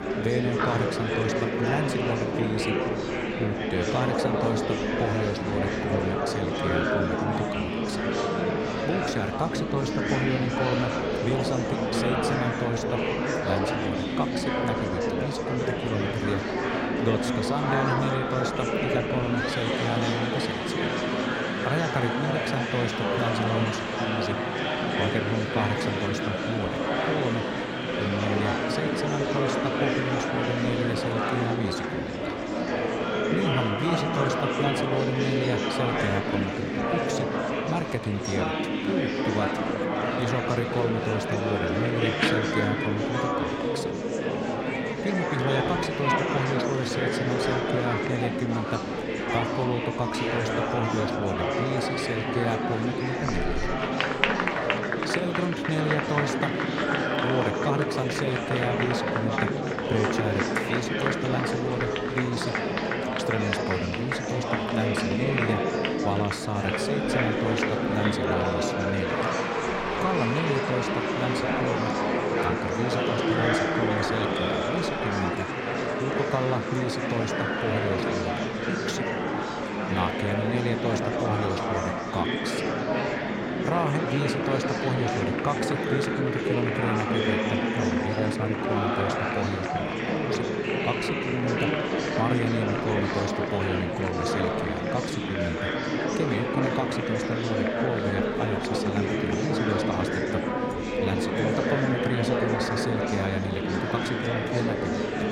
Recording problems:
murmuring crowd; very loud; throughout; 4 dB above the speech

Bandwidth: 16 kHz